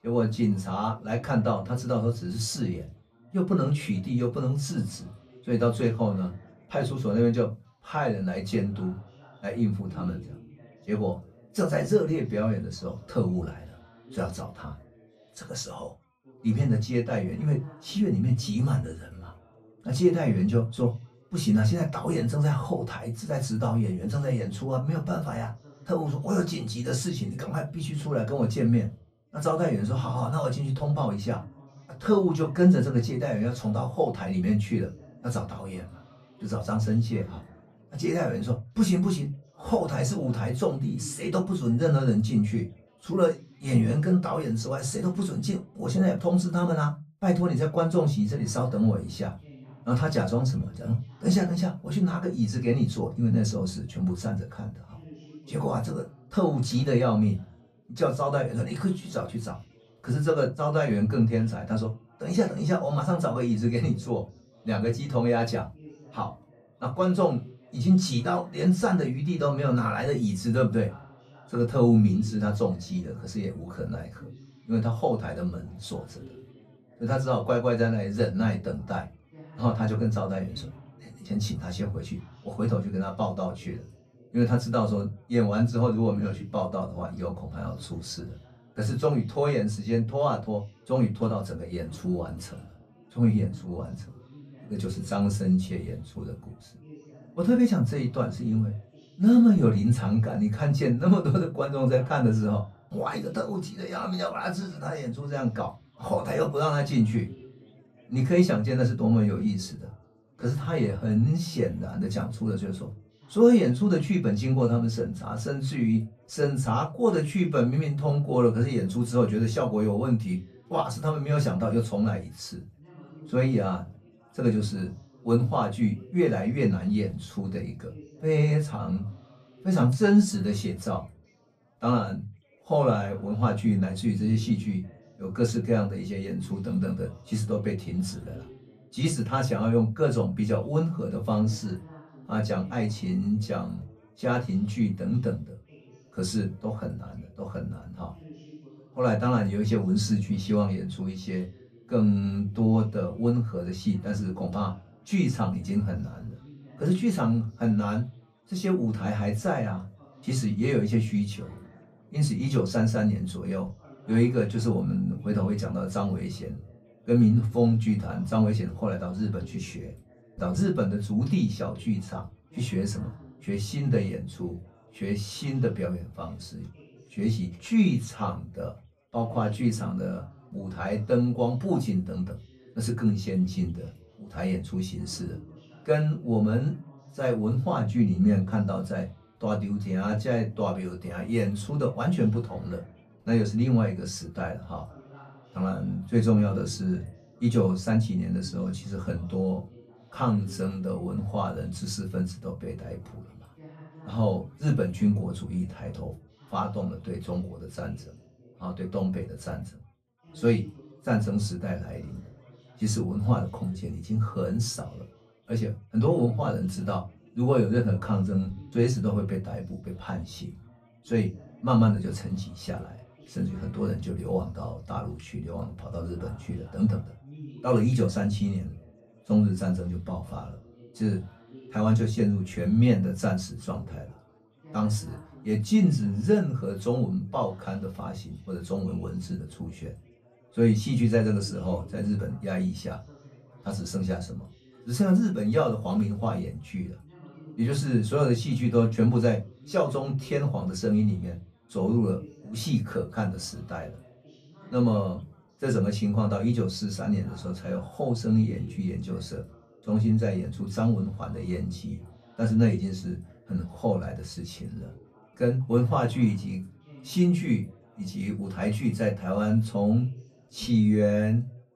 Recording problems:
off-mic speech; far
room echo; very slight; dies away in 0.2 s
background chatter; faint; throughout; 3 voices, 25 dB below the speech

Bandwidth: 14.5 kHz